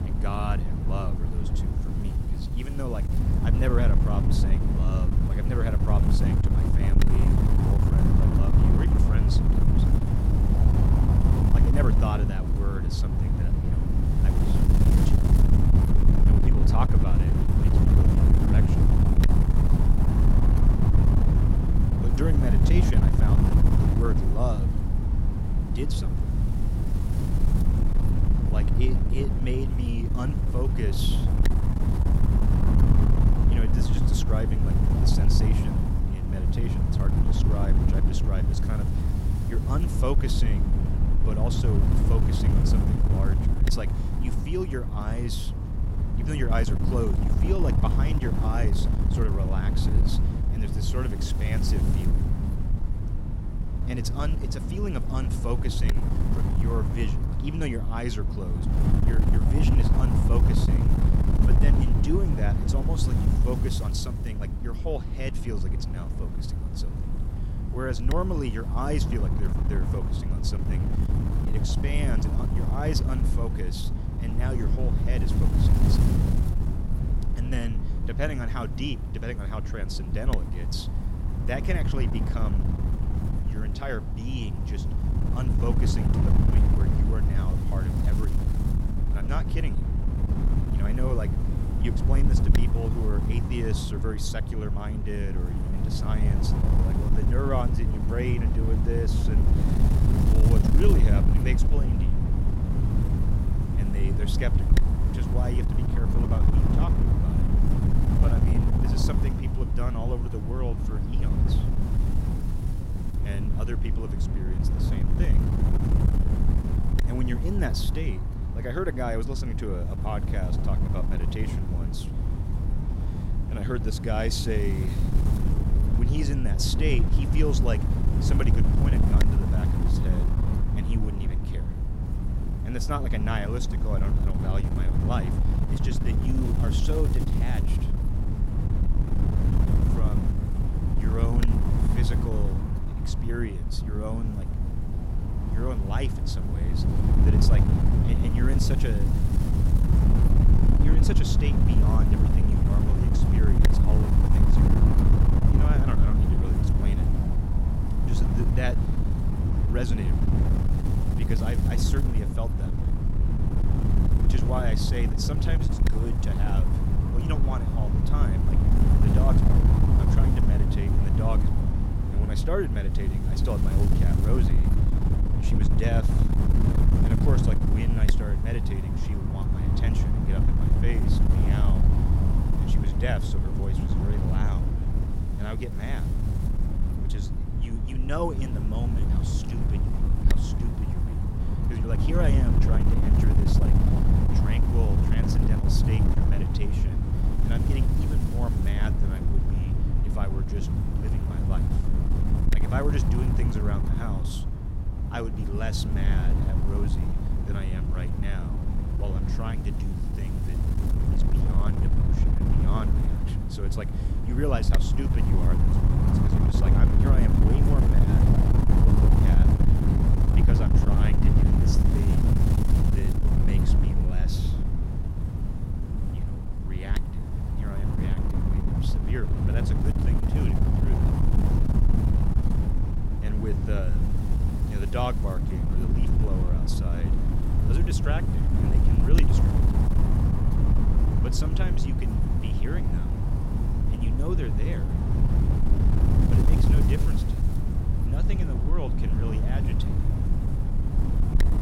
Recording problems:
wind noise on the microphone; heavy; as loud as the speech

